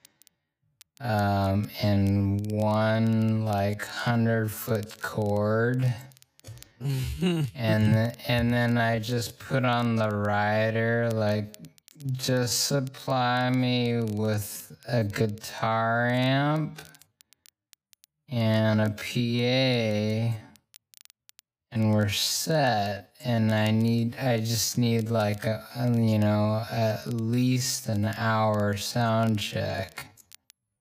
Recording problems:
wrong speed, natural pitch; too slow; 0.5 times normal speed
crackle, like an old record; faint; 30 dB below the speech

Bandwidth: 15 kHz